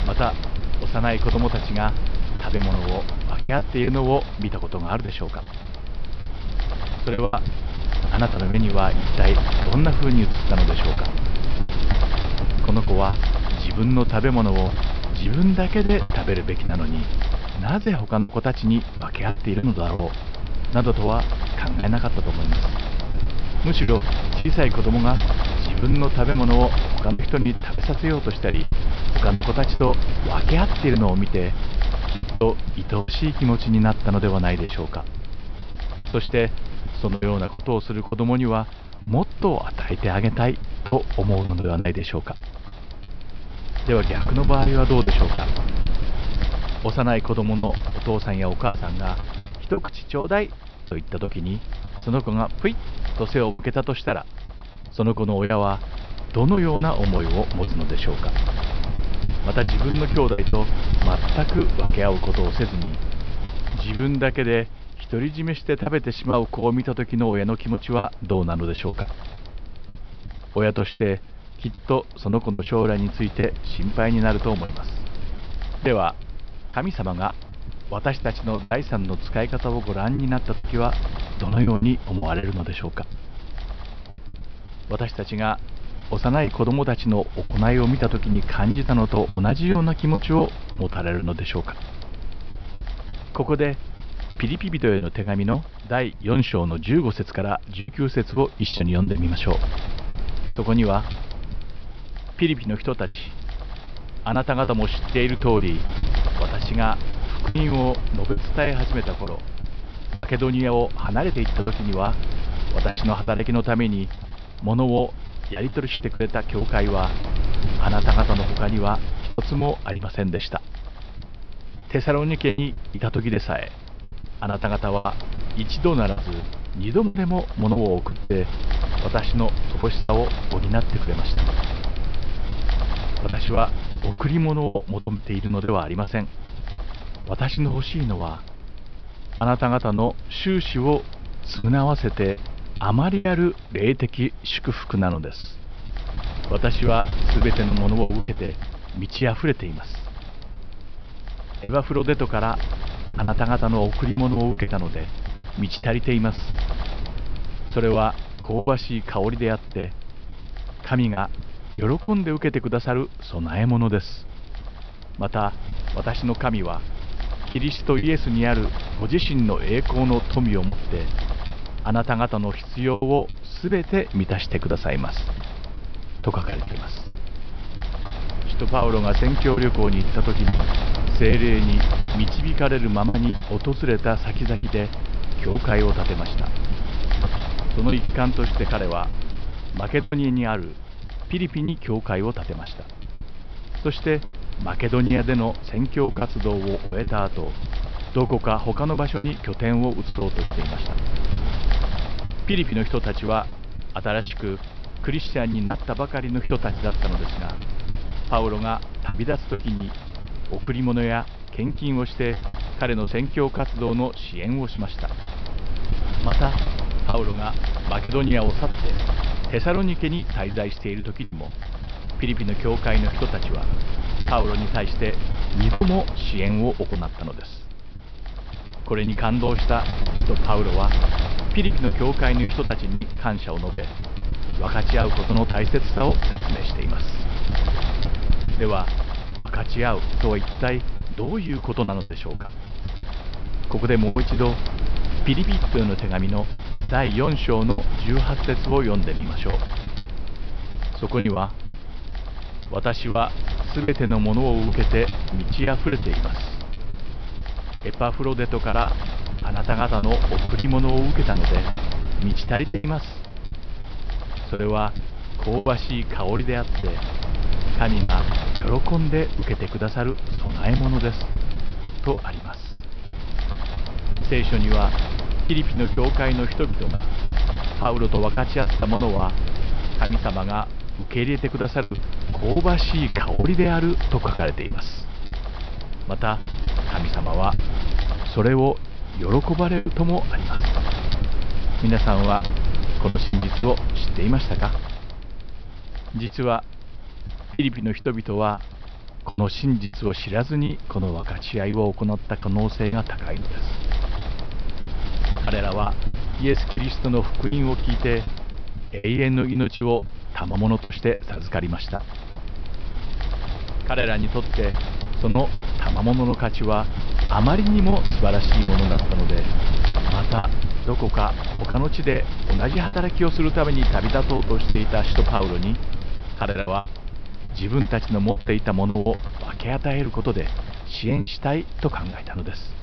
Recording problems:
high frequencies cut off; noticeable; nothing above 5.5 kHz
wind noise on the microphone; heavy; 10 dB below the speech
choppy; very; 8% of the speech affected

